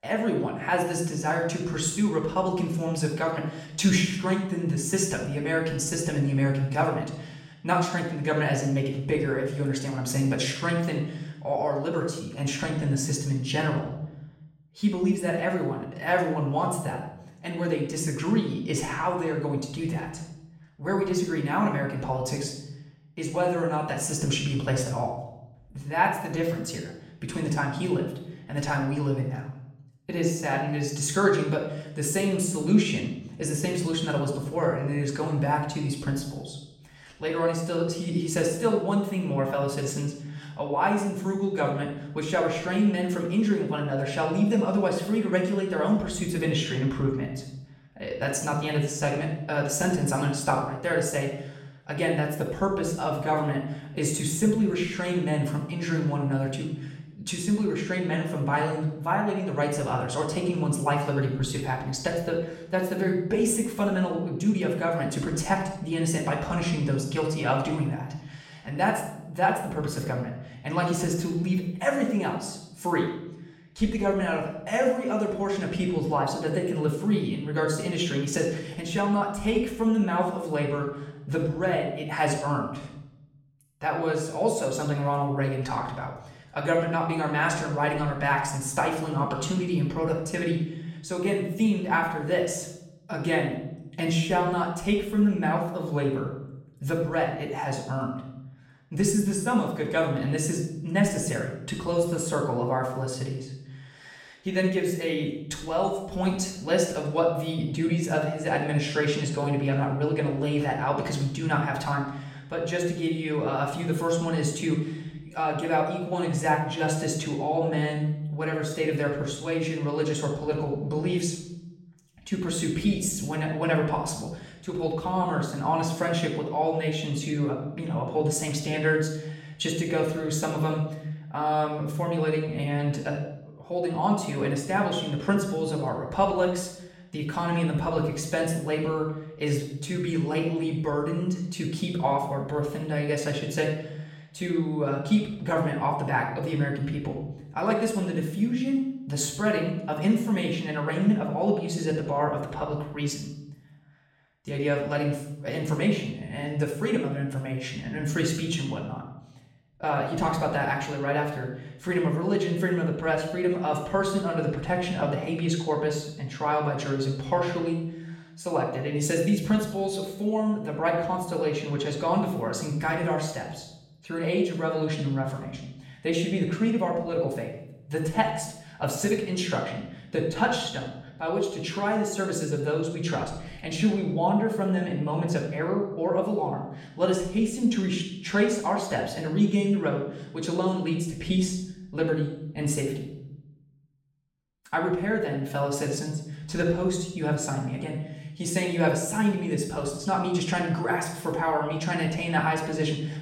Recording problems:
off-mic speech; far
room echo; noticeable; dies away in 0.8 s

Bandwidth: 16 kHz